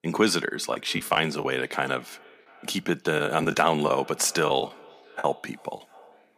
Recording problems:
echo of what is said; faint; throughout; 340 ms later, 25 dB below the speech
choppy; very; 7% of the speech affected

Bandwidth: 15 kHz